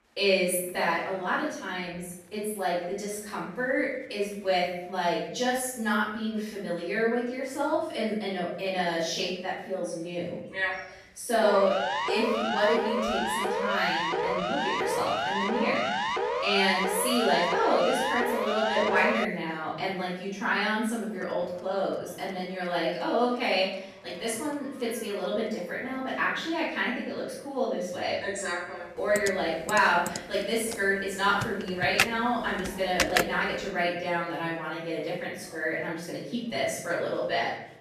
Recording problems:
off-mic speech; far
room echo; noticeable; dies away in 0.7 s
chatter from many people; faint; throughout; 25 dB below the speech
siren; loud; from 11 to 19 s; peak 1 dB above the speech
keyboard typing; loud; from 29 to 33 s; peak 3 dB above the speech

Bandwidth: 14.5 kHz